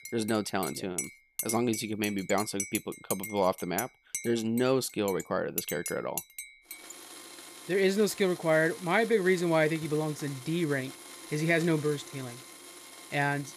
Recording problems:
household noises; noticeable; throughout; 10 dB below the speech

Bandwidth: 15 kHz